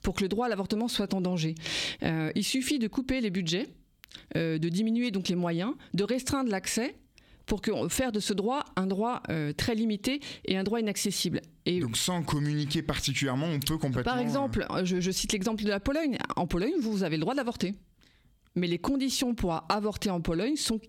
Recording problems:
squashed, flat; heavily

